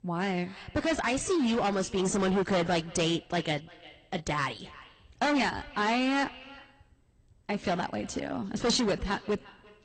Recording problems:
distortion; heavy; 11% of the sound clipped
echo of what is said; faint; throughout; 350 ms later, 20 dB below the speech
garbled, watery; slightly; nothing above 8.5 kHz

